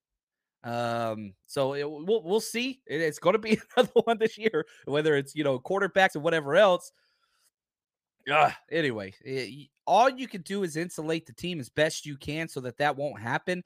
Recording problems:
uneven, jittery; strongly; from 1.5 to 10 s

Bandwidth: 15 kHz